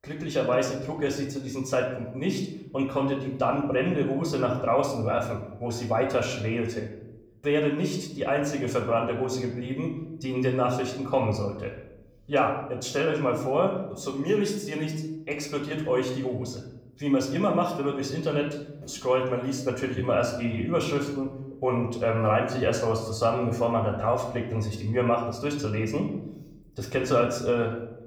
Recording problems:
room echo; slight; dies away in 0.8 s
off-mic speech; somewhat distant

